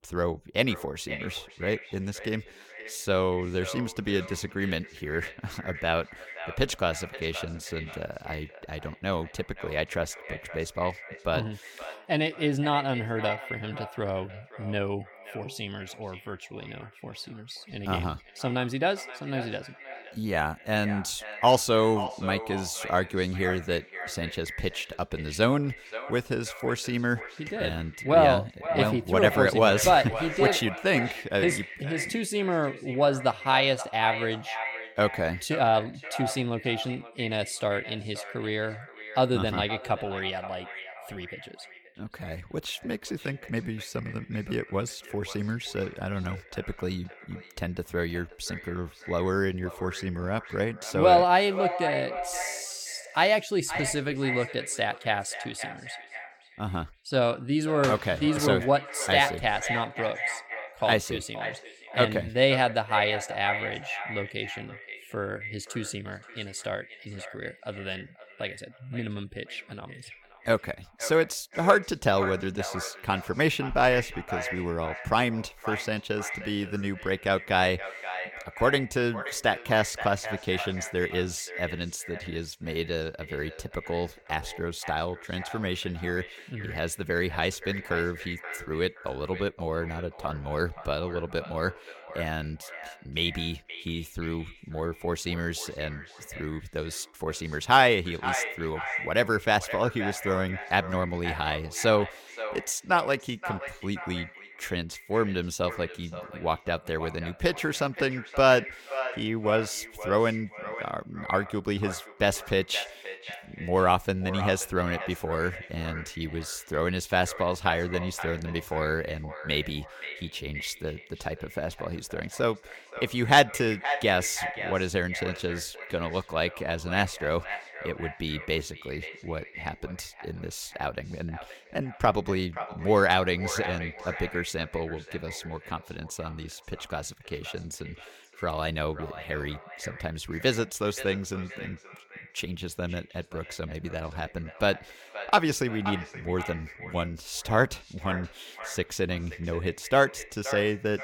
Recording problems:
echo of what is said; strong; throughout; 530 ms later, 10 dB below the speech

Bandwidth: 17 kHz